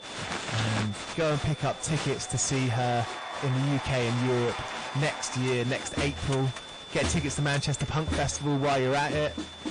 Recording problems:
distortion; heavy; 16% of the sound clipped
garbled, watery; slightly; nothing above 9 kHz
crowd noise; loud; throughout; 8 dB below the speech
household noises; loud; until 2.5 s; 6 dB below the speech
high-pitched whine; noticeable; throughout; 3.5 kHz, 15 dB below the speech

